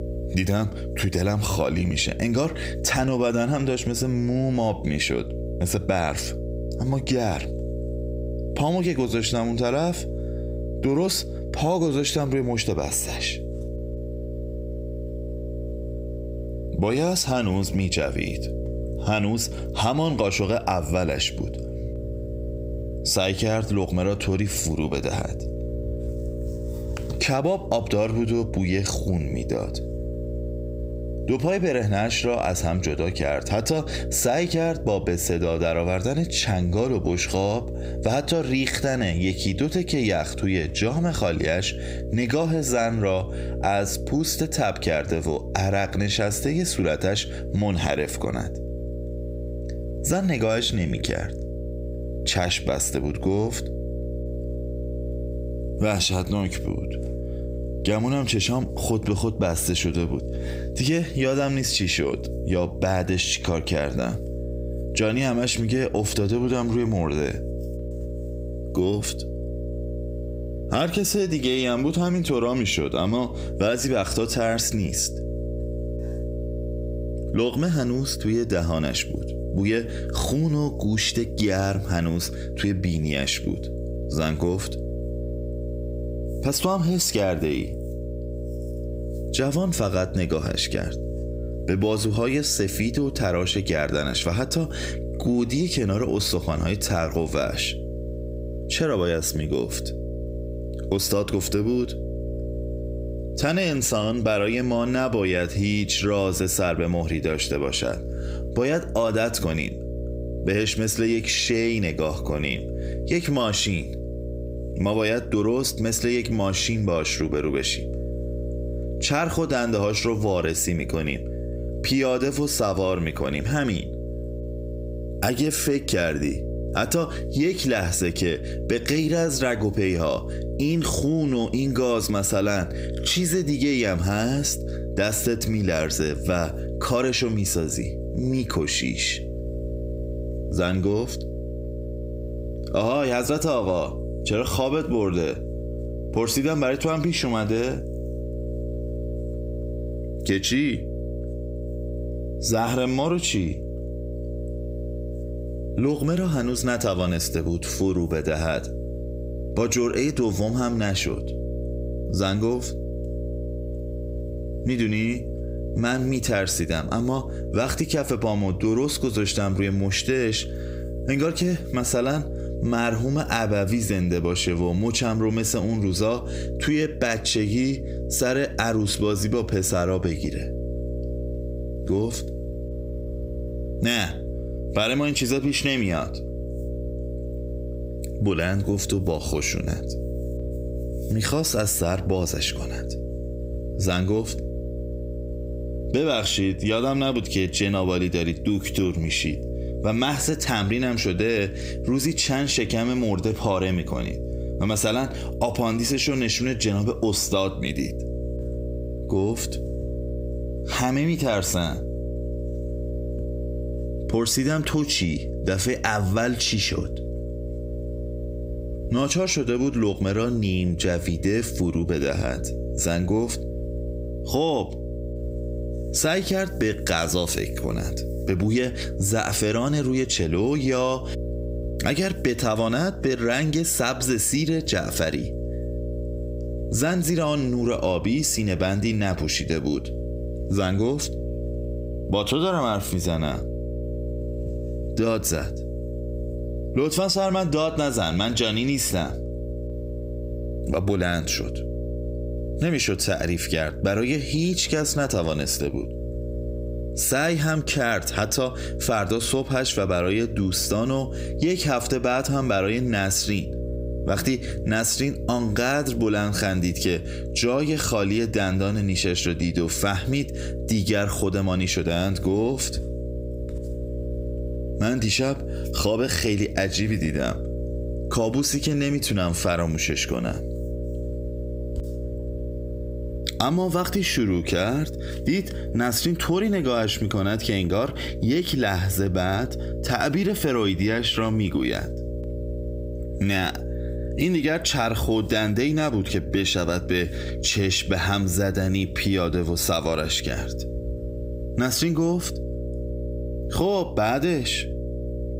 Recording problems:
squashed, flat; heavily
electrical hum; noticeable; throughout; 60 Hz, 15 dB below the speech

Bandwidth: 15.5 kHz